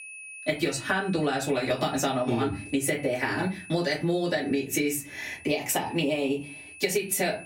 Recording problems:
off-mic speech; far
room echo; very slight; dies away in 0.2 s
squashed, flat; somewhat
high-pitched whine; noticeable; throughout; 2.5 kHz, 20 dB below the speech

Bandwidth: 16 kHz